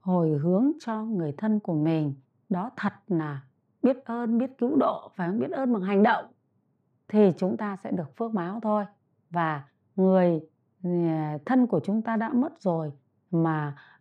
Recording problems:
muffled; slightly; fading above 3 kHz

